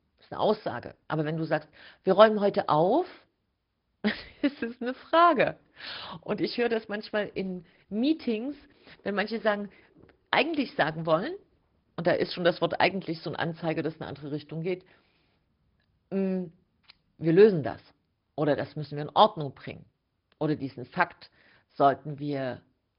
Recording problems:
high frequencies cut off; noticeable; nothing above 5 kHz
garbled, watery; slightly

